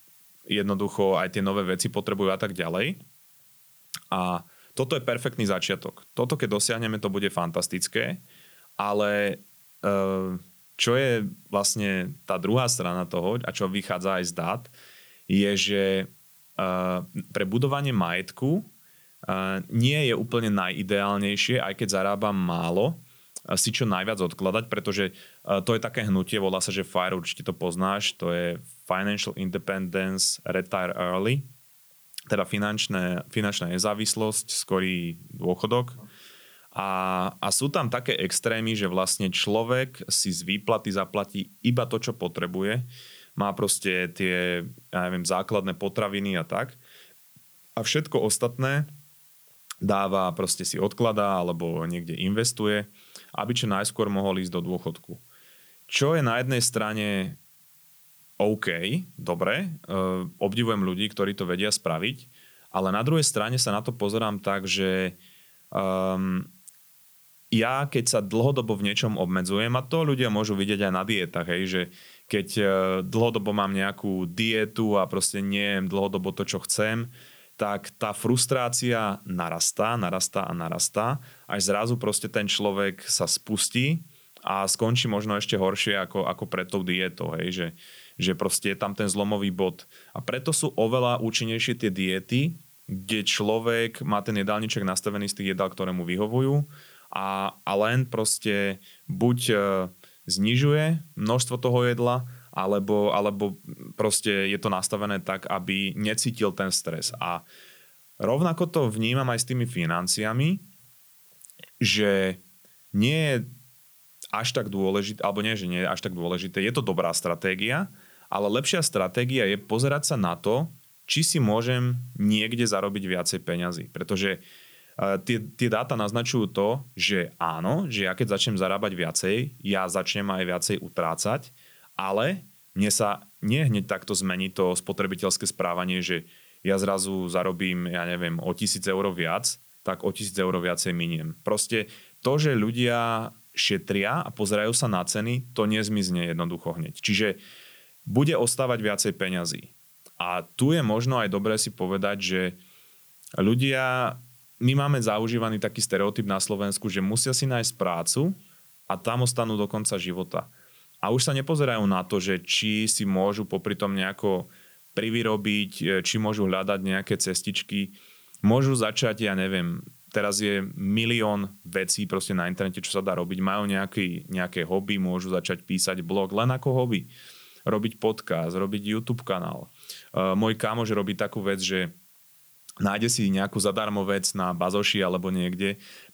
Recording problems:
hiss; faint; throughout; 25 dB below the speech

